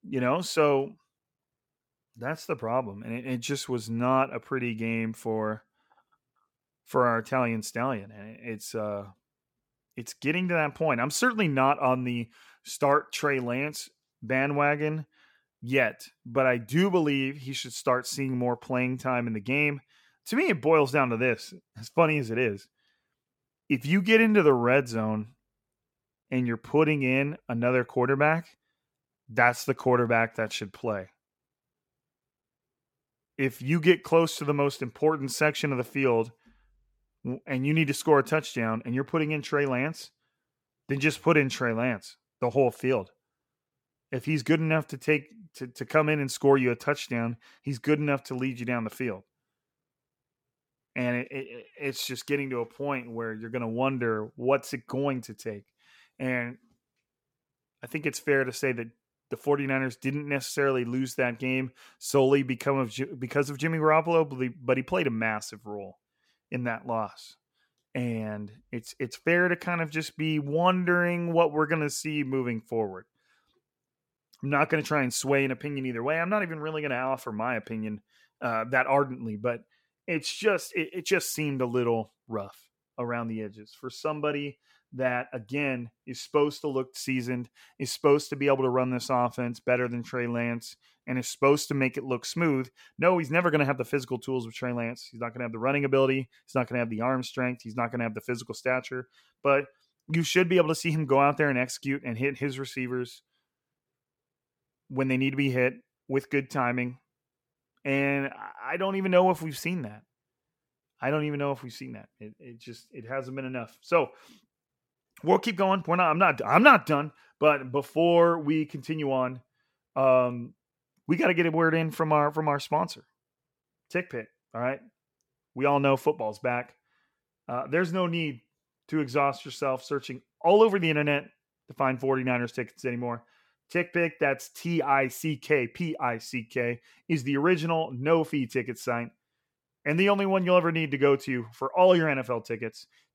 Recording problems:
none

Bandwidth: 17 kHz